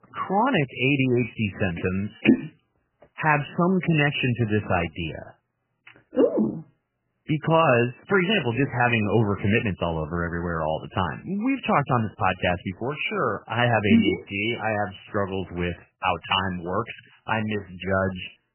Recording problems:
garbled, watery; badly; nothing above 3 kHz

